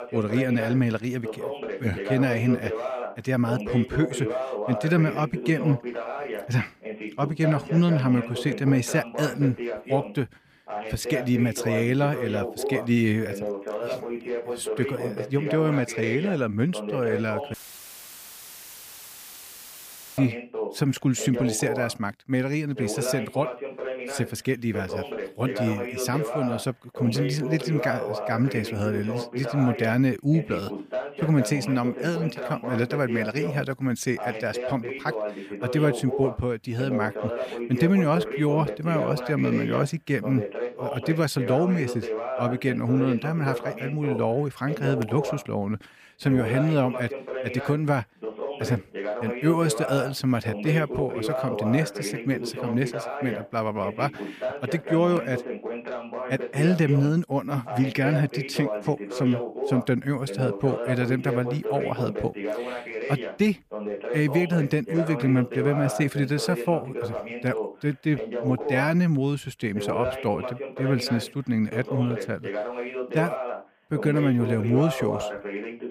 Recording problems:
voice in the background; loud; throughout; 6 dB below the speech
audio cutting out; filled with static; at 18 s for 2.5 s

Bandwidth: 15 kHz